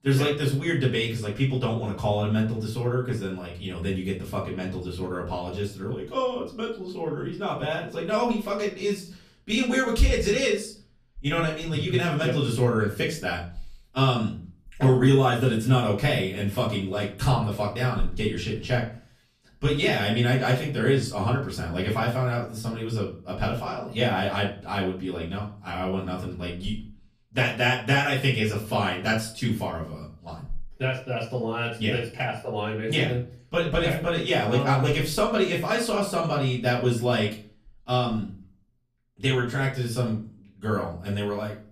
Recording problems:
off-mic speech; far
room echo; slight; dies away in 0.4 s

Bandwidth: 14.5 kHz